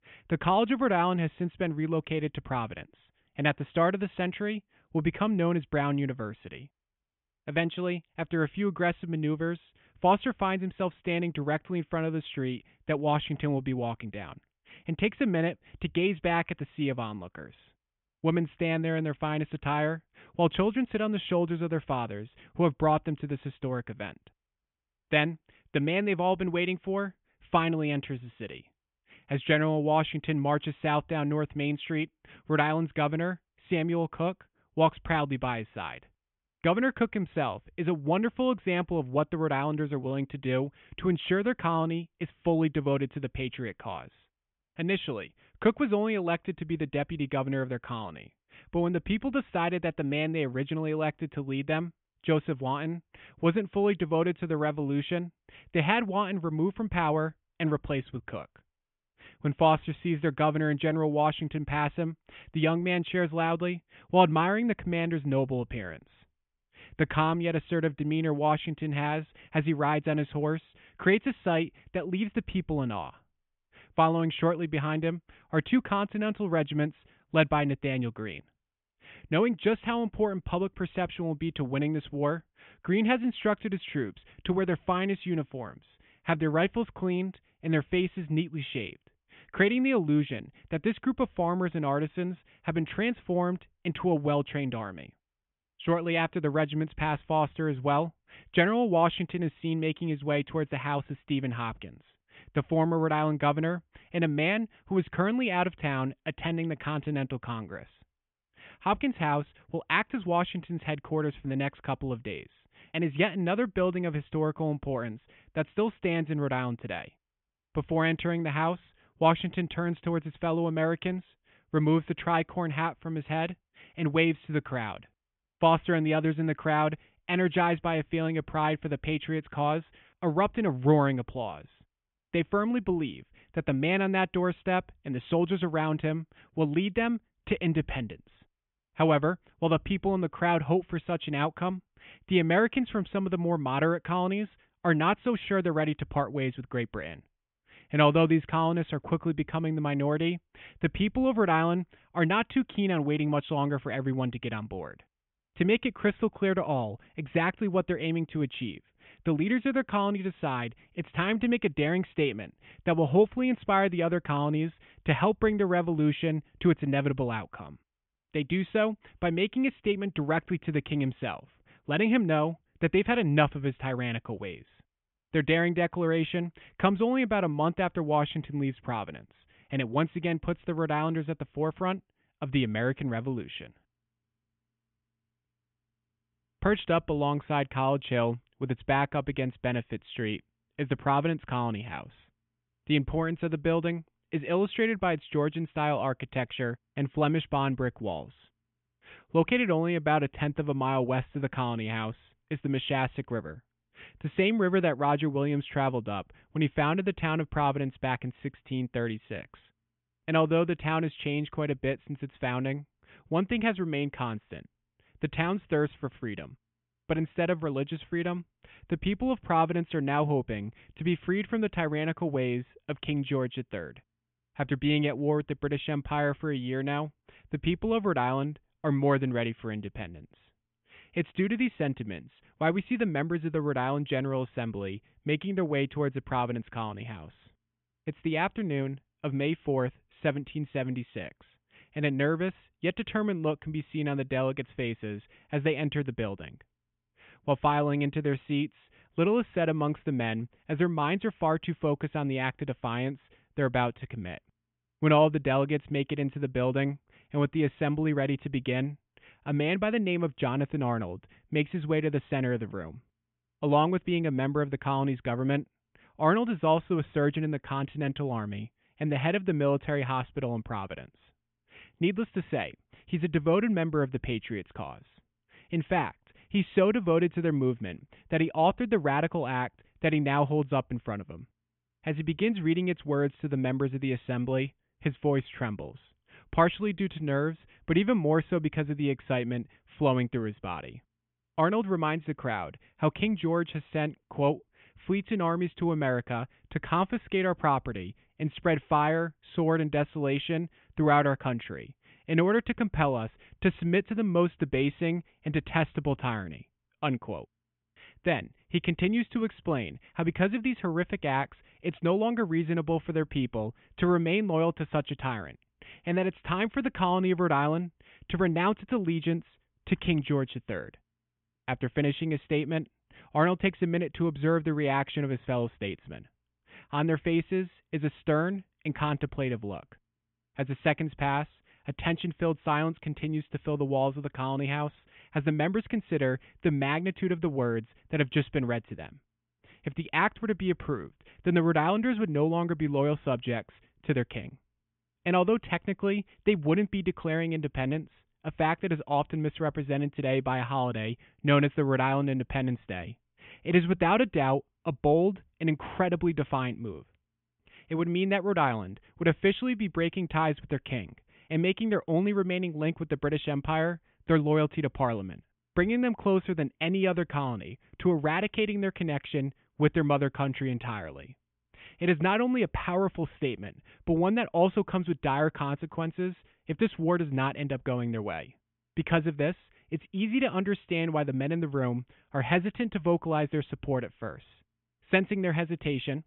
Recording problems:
high frequencies cut off; severe; nothing above 3.5 kHz

